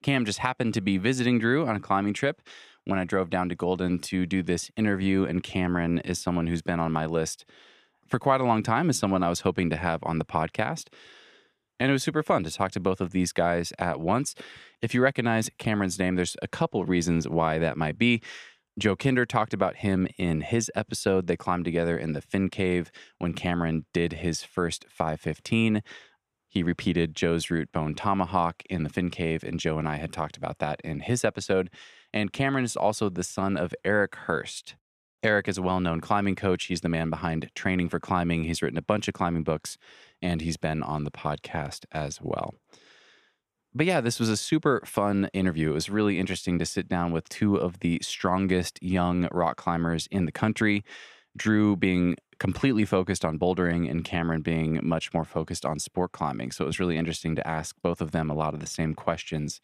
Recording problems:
none

